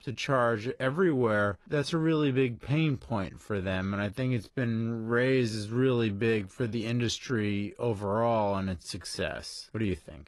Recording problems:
wrong speed, natural pitch; too slow; 0.6 times normal speed
garbled, watery; slightly; nothing above 11 kHz

